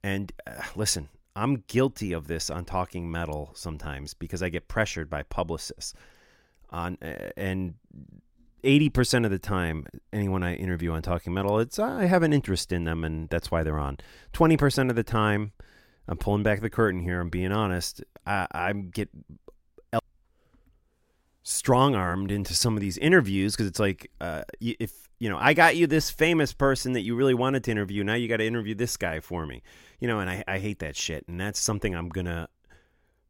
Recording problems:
none

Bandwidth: 16.5 kHz